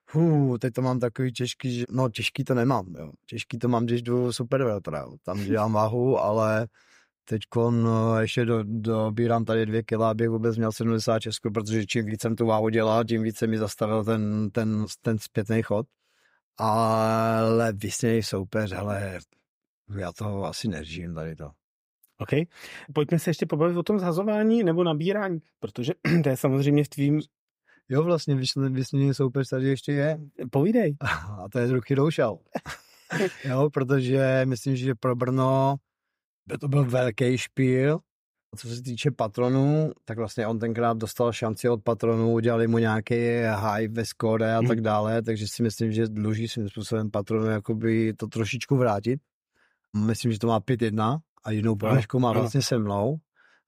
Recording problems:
none

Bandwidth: 15.5 kHz